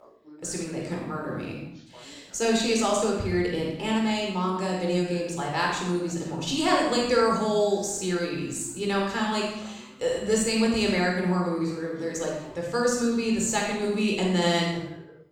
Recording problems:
off-mic speech; far
room echo; noticeable; dies away in 0.7 s
voice in the background; faint; throughout; 25 dB below the speech

